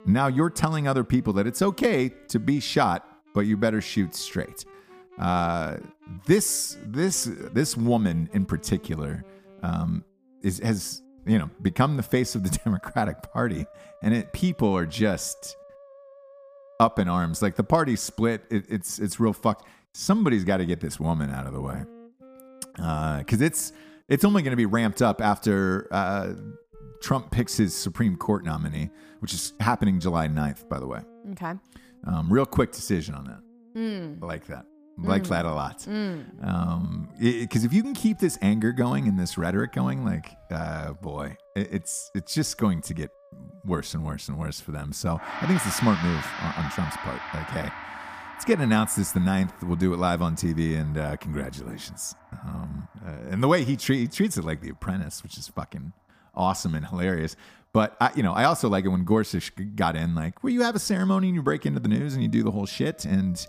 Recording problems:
background music; noticeable; throughout; 20 dB below the speech

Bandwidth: 15 kHz